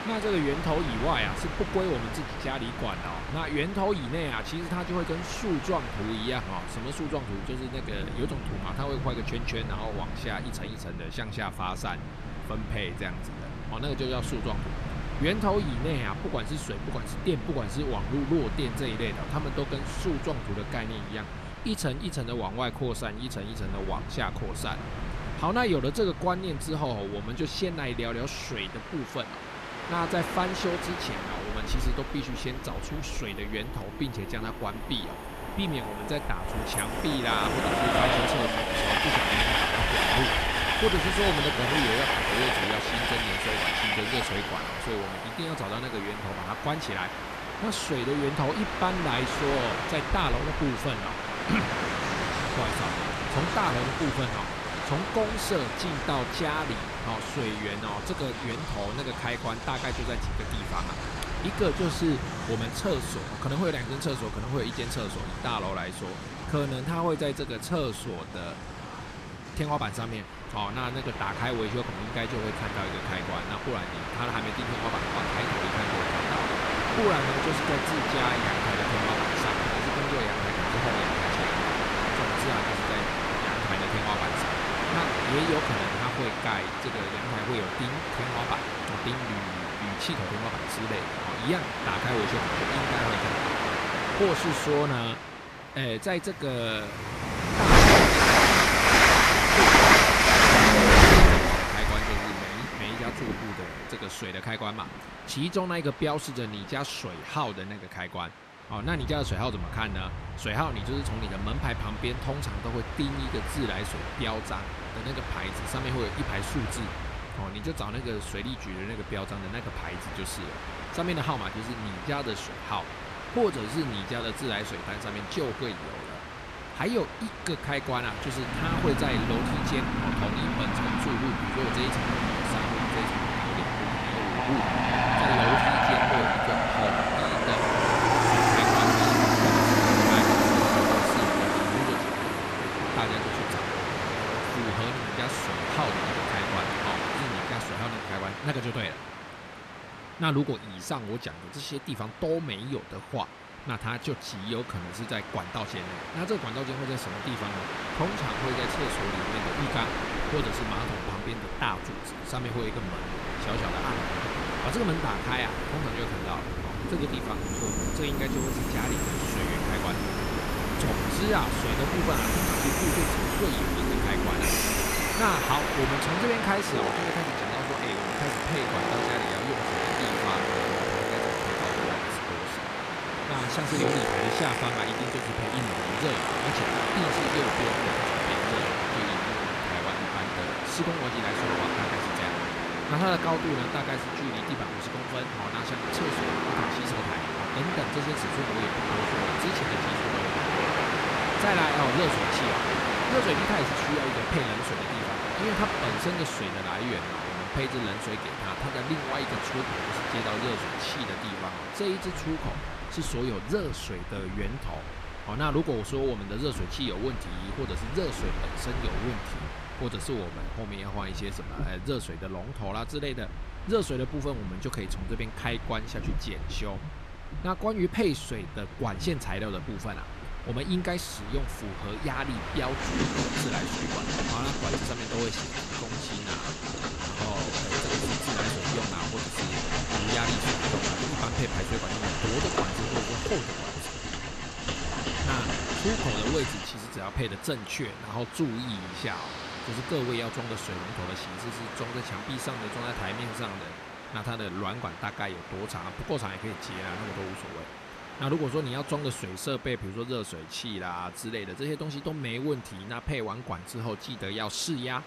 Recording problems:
train or aircraft noise; very loud; throughout; 5 dB above the speech

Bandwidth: 13.5 kHz